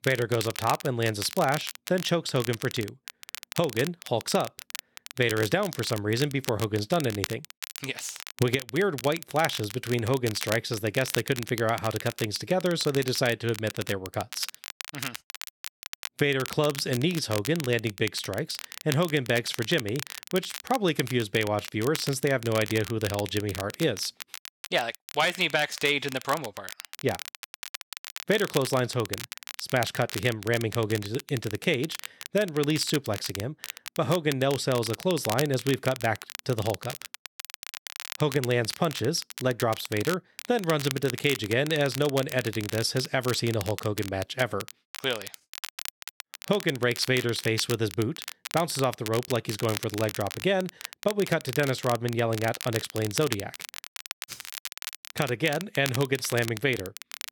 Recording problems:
crackle, like an old record; noticeable; 10 dB below the speech

